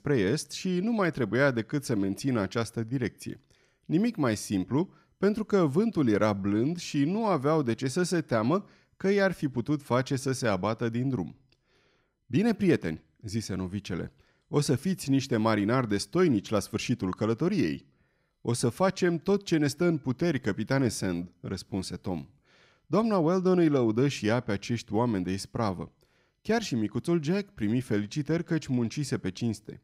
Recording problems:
none

